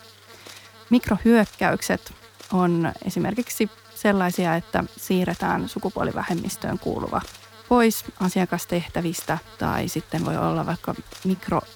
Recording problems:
electrical hum; noticeable; throughout; 50 Hz, 20 dB below the speech

